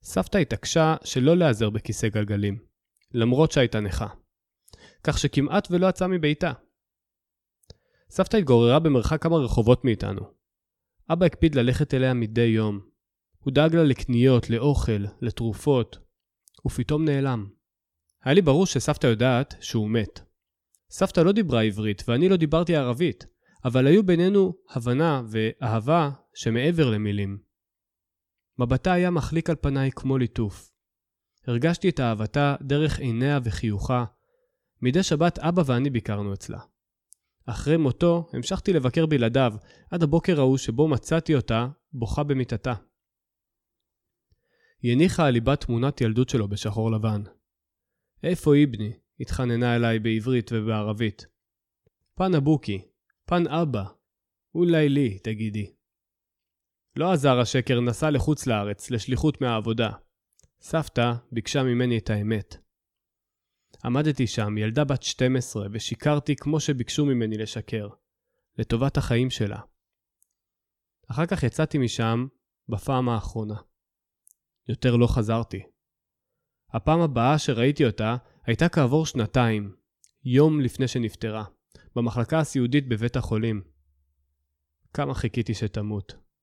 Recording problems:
none

